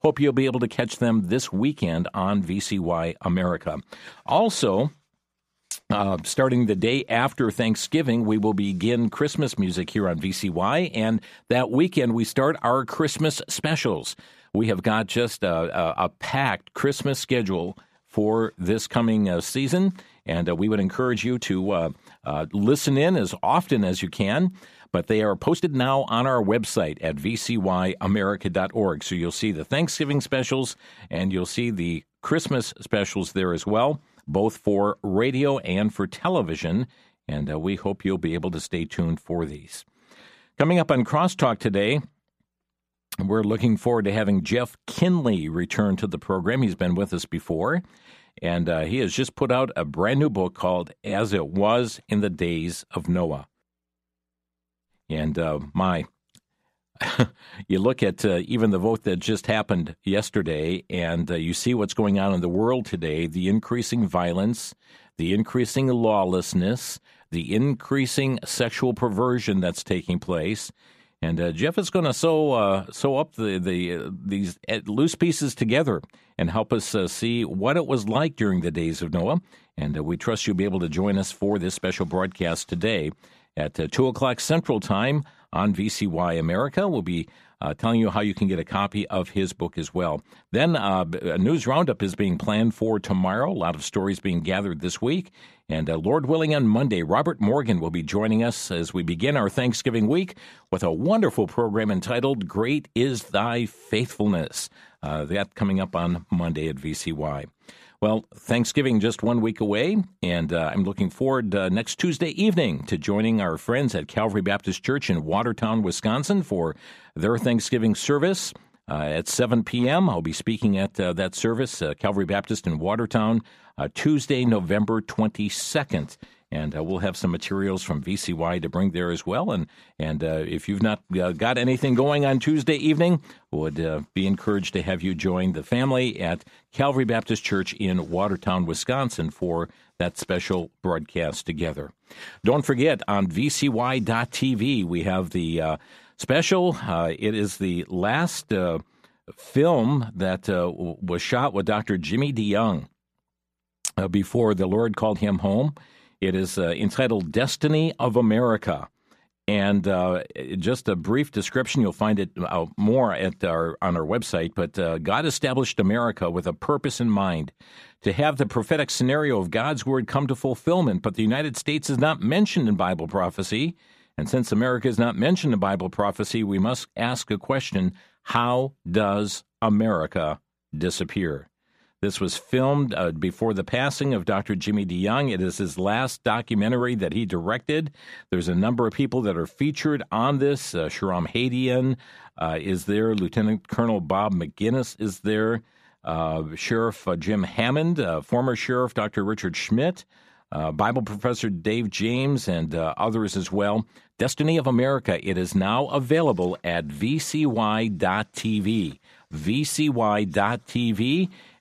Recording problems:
uneven, jittery; strongly; from 14 s to 3:25

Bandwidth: 14.5 kHz